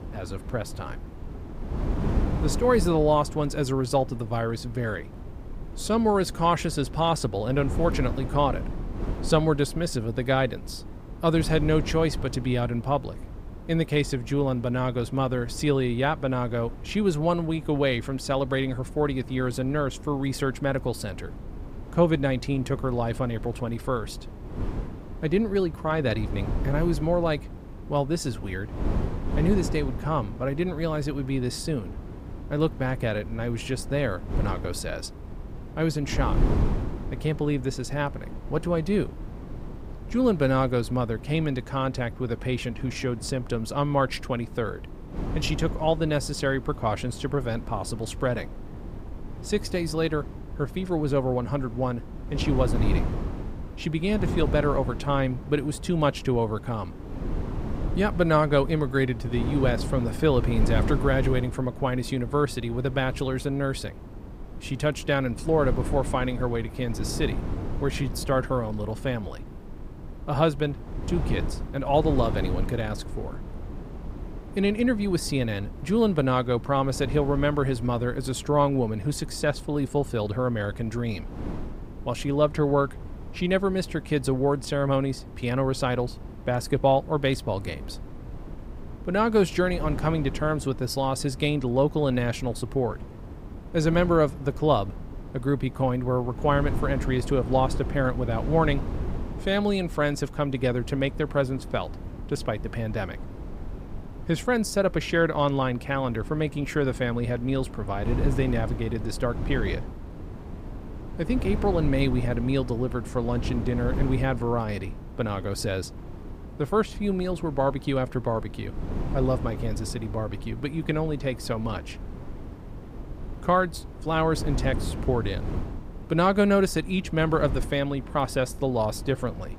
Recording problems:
wind noise on the microphone; occasional gusts; 15 dB below the speech

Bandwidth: 15.5 kHz